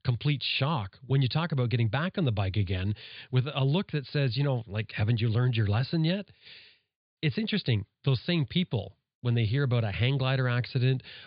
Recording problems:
high frequencies cut off; severe; nothing above 4.5 kHz

